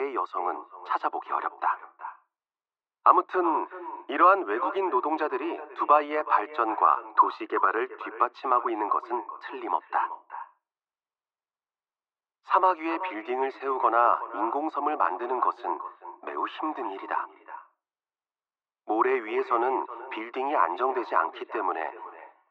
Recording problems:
muffled; very; fading above 3.5 kHz
thin; very; fading below 350 Hz
echo of what is said; noticeable; throughout; 370 ms later, 15 dB below the speech
abrupt cut into speech; at the start

